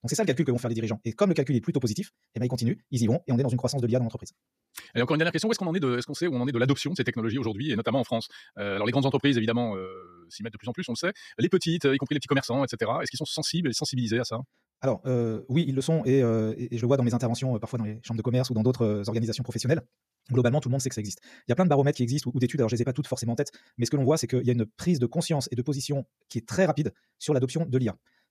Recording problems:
wrong speed, natural pitch; too fast; 1.8 times normal speed

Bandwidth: 14.5 kHz